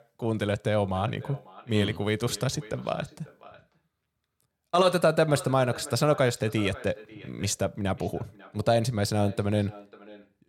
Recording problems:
echo of what is said; faint; throughout; 540 ms later, 20 dB below the speech

